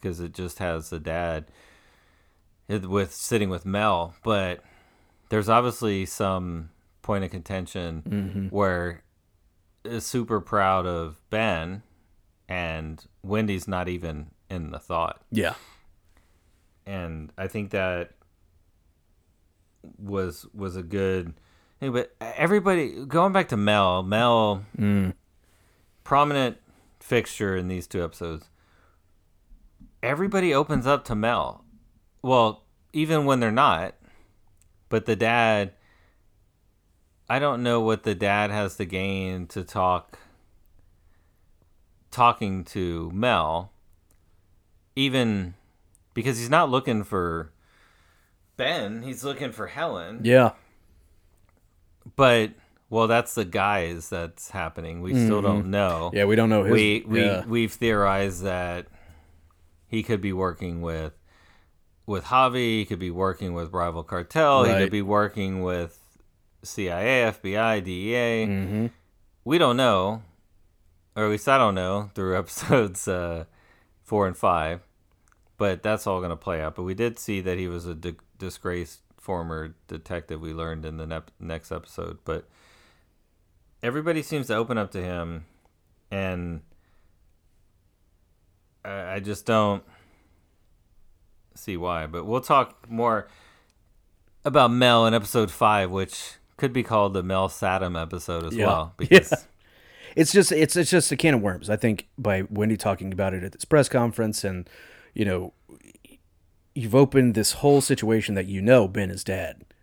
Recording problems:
none

